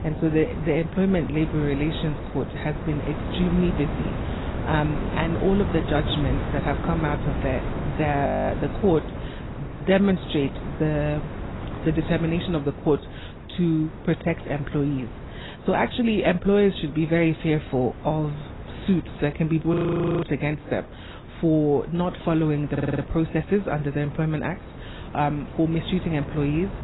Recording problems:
garbled, watery; badly; nothing above 4 kHz
wind noise on the microphone; occasional gusts; 10 dB below the speech
audio freezing; at 8.5 s and at 20 s
audio stuttering; at 23 s

